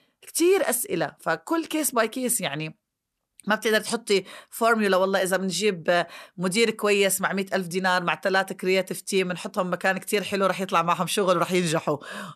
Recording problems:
none

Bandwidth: 13.5 kHz